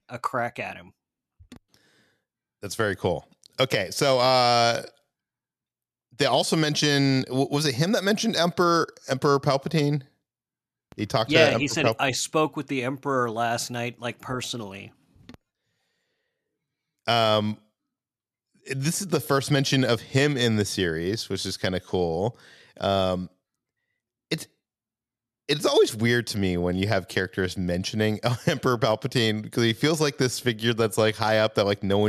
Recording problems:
abrupt cut into speech; at the end

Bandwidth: 13.5 kHz